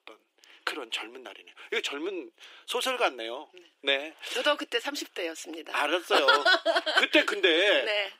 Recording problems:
thin; very; fading below 300 Hz

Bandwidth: 15.5 kHz